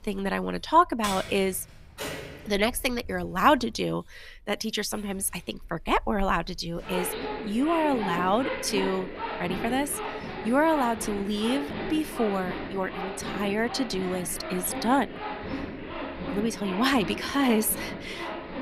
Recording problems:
household noises; loud; throughout; 8 dB below the speech

